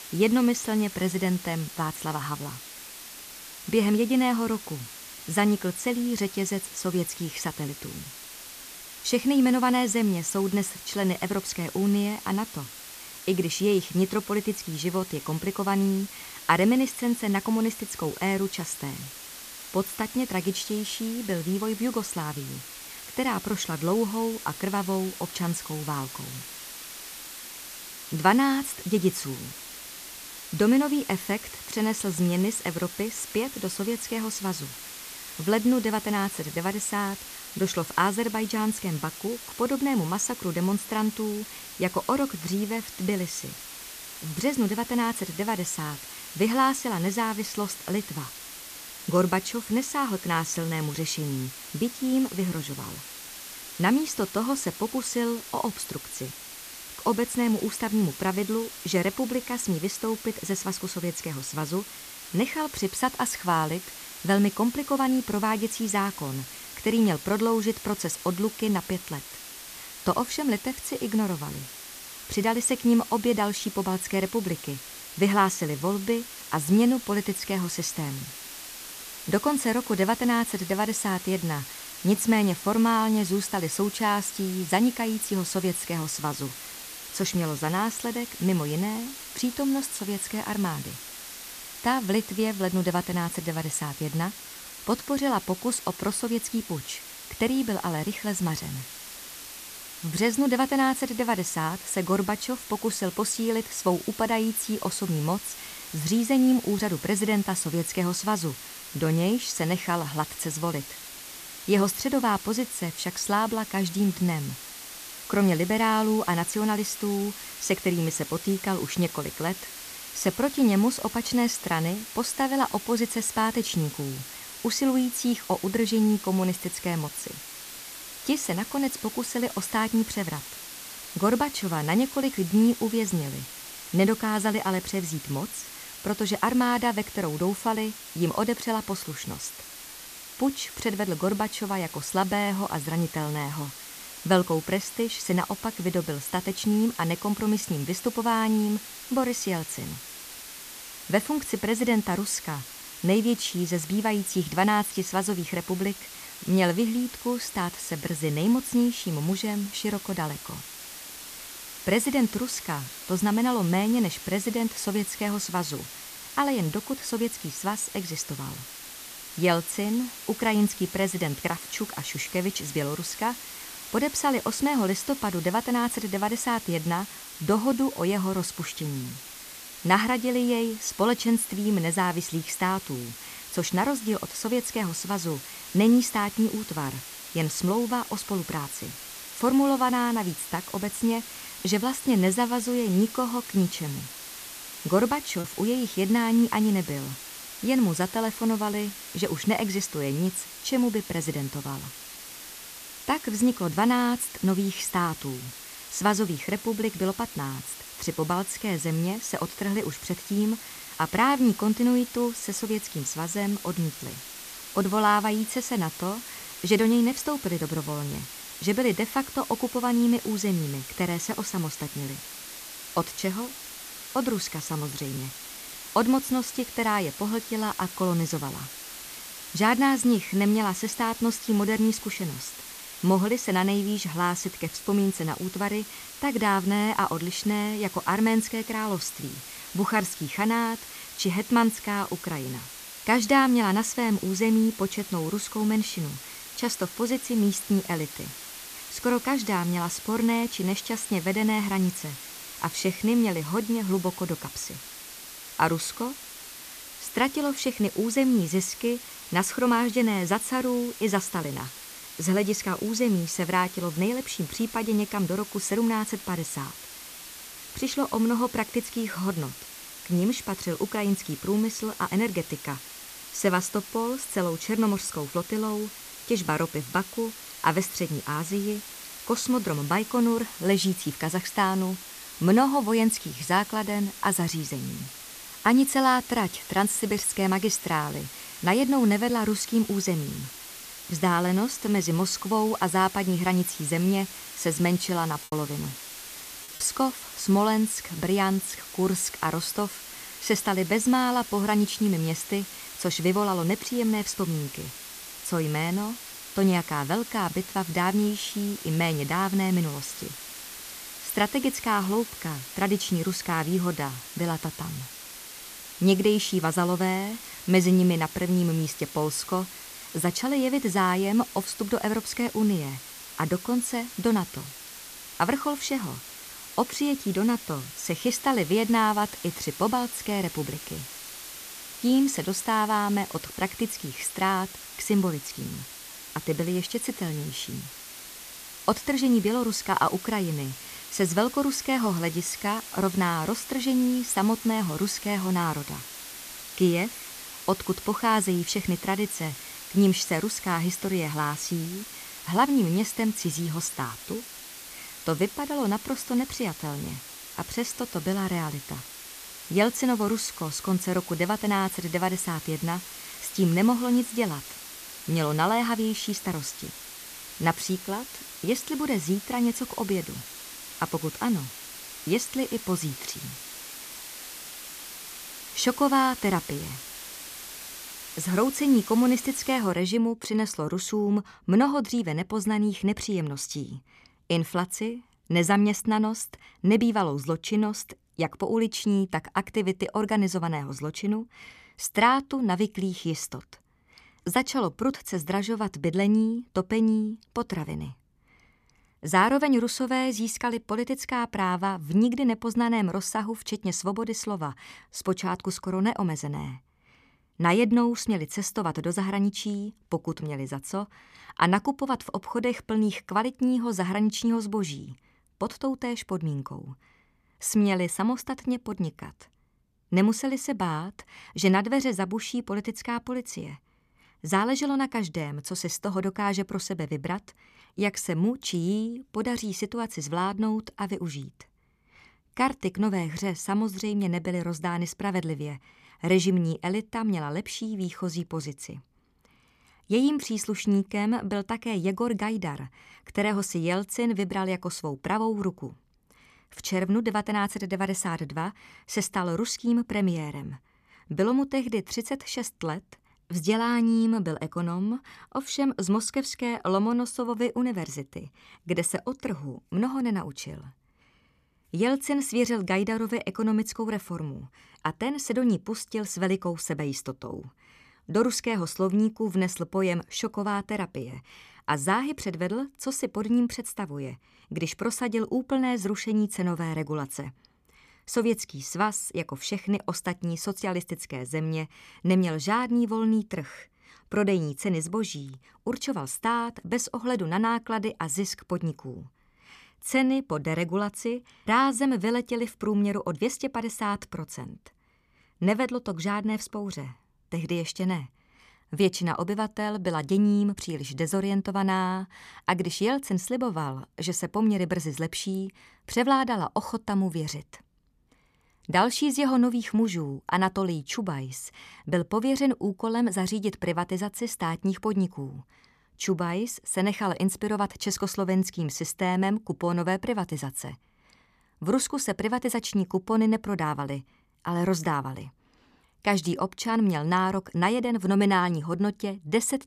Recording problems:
hiss; noticeable; until 6:20; 10 dB below the speech
choppy; very; at 3:15 and from 4:55 to 4:57; 6% of the speech affected

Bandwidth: 14.5 kHz